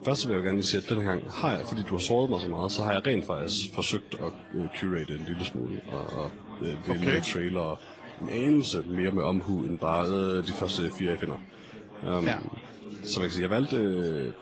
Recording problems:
high frequencies cut off; noticeable; nothing above 7.5 kHz
garbled, watery; slightly
chatter from many people; noticeable; throughout; 15 dB below the speech

